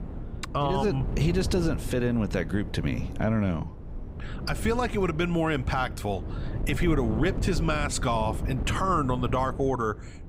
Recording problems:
wind noise on the microphone; occasional gusts; 15 dB below the speech

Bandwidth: 15.5 kHz